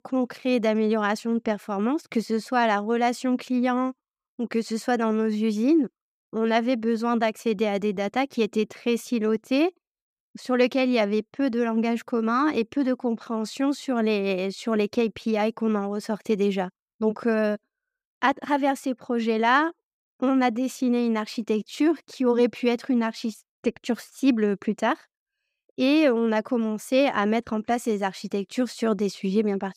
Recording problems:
none

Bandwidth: 15 kHz